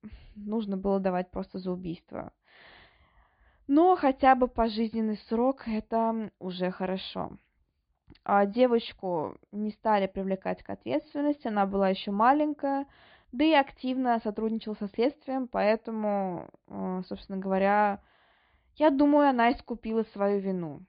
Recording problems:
high frequencies cut off; severe; nothing above 4.5 kHz

